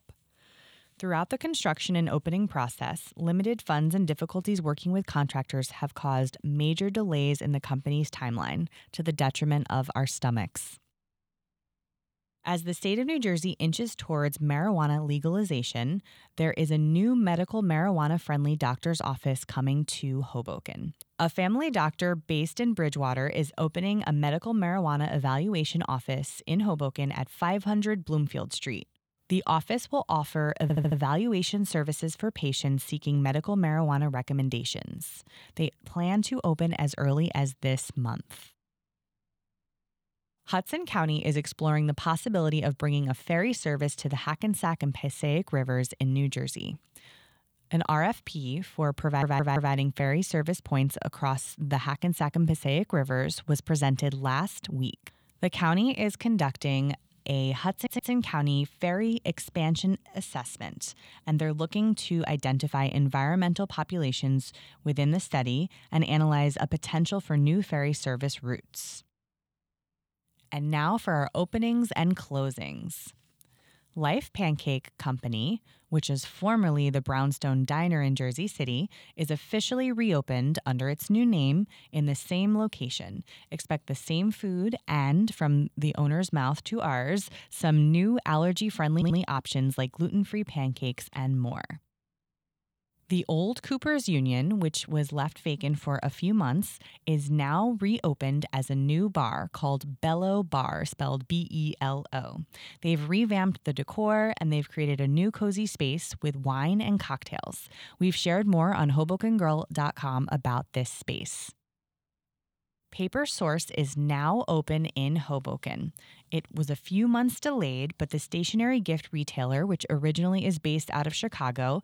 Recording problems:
audio stuttering; 4 times, first at 31 s

